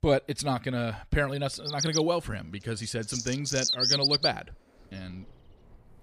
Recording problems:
animal sounds; very loud; from 2 s on; 3 dB above the speech

